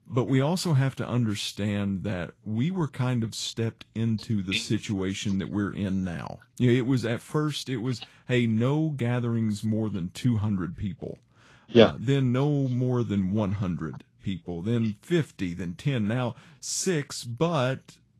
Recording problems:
garbled, watery; slightly; nothing above 12.5 kHz

